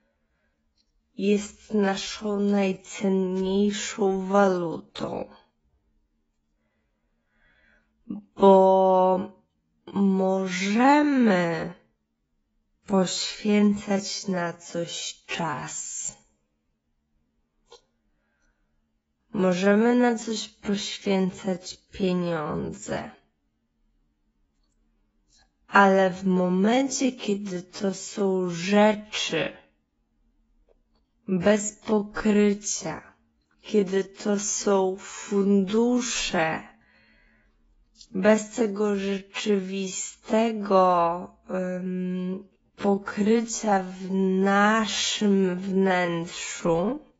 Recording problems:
garbled, watery; badly; nothing above 7.5 kHz
wrong speed, natural pitch; too slow; 0.5 times normal speed

